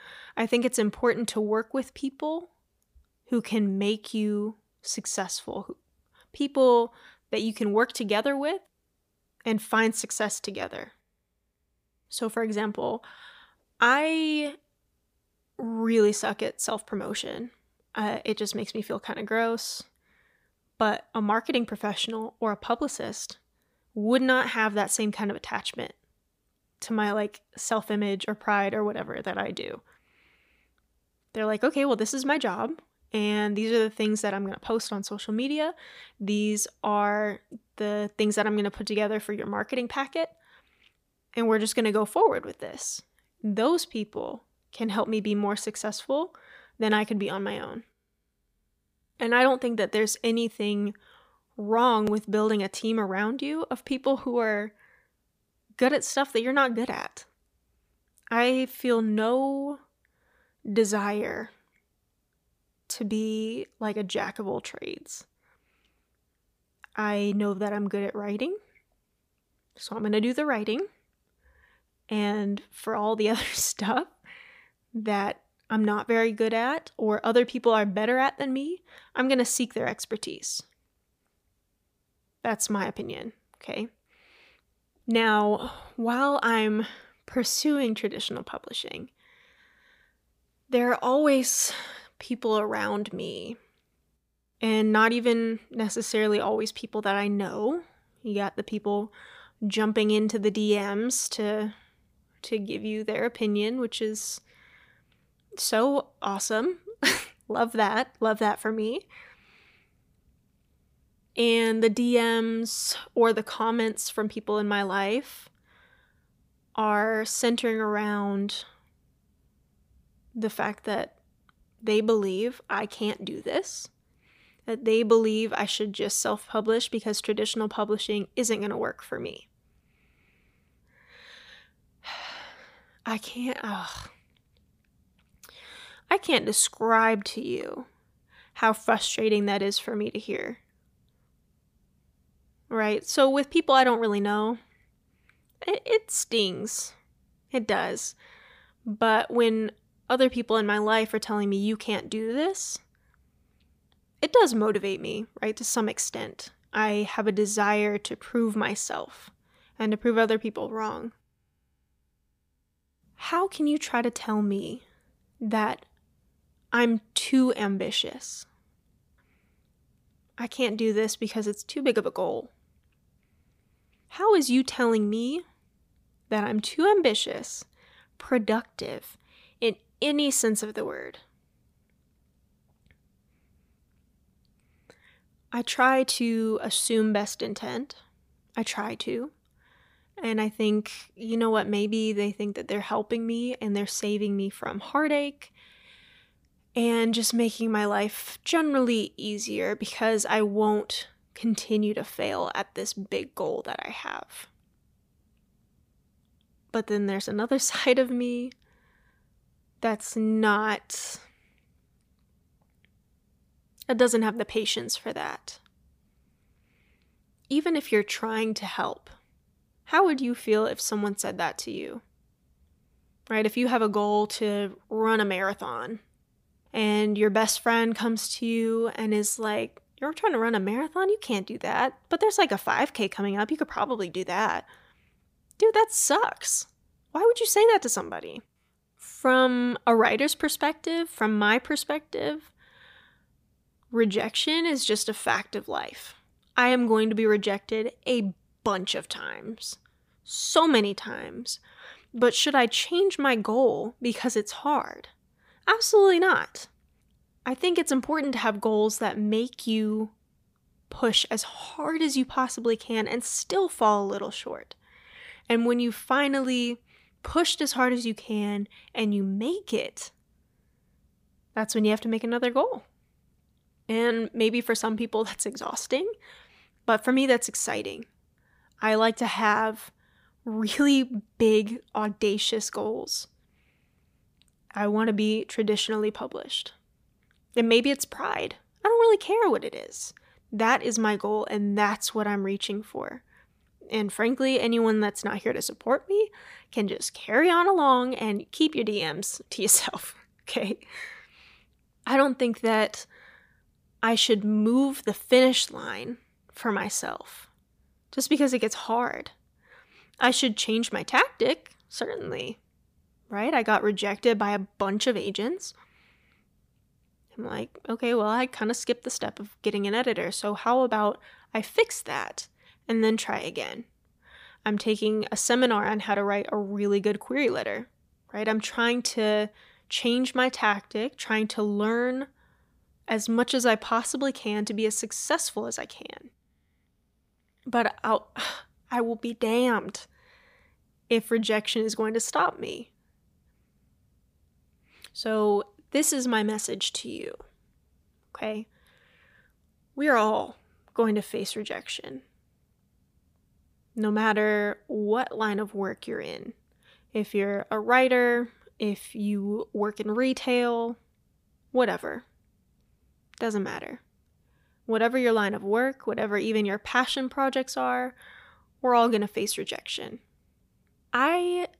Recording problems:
none

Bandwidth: 15 kHz